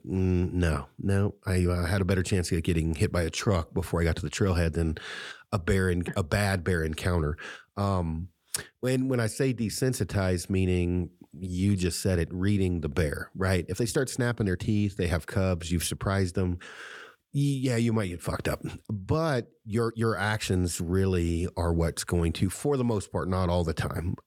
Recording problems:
uneven, jittery; strongly; from 1.5 to 22 s

